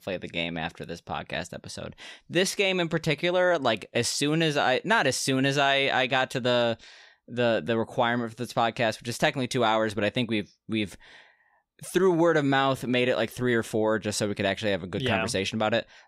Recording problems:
none

